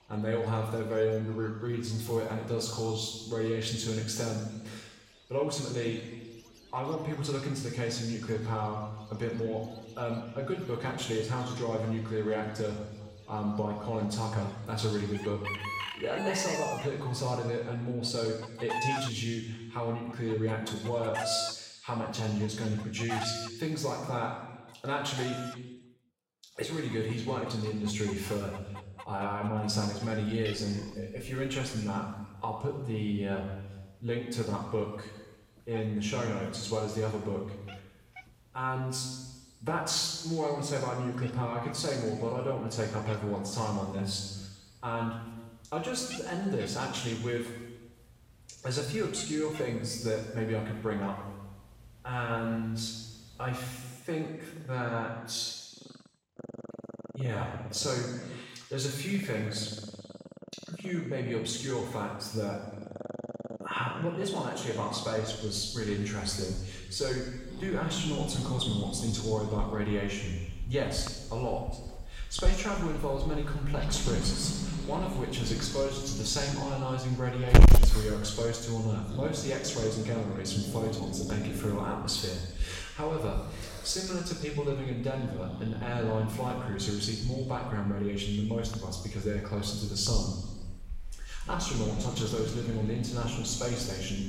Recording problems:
off-mic speech; far
room echo; noticeable; dies away in 1.2 s
distortion; slight; 0.1% of the sound clipped
animal sounds; loud; throughout; 3 dB below the speech

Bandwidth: 16 kHz